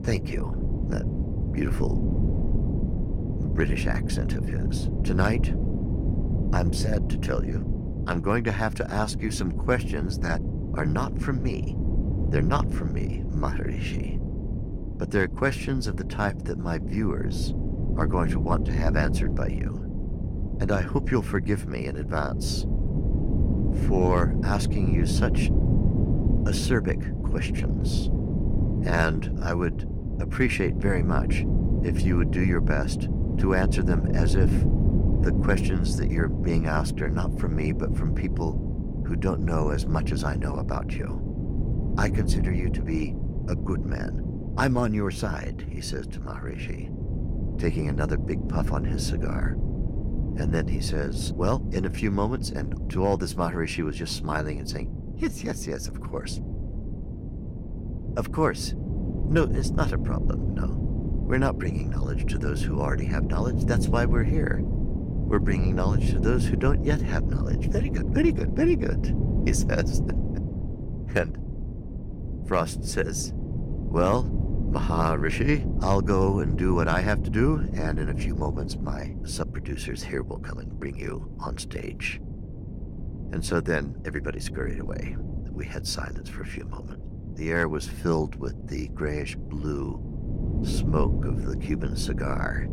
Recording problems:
wind noise on the microphone; heavy; 8 dB below the speech

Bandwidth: 16.5 kHz